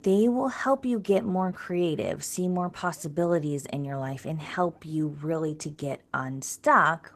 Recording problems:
garbled, watery; slightly; nothing above 13.5 kHz

